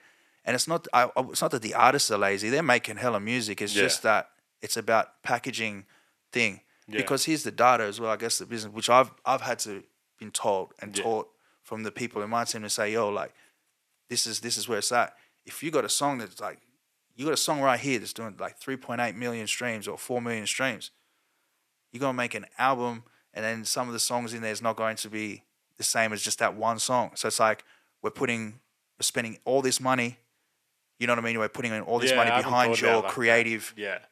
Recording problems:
thin; very; fading below 450 Hz

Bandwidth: 14 kHz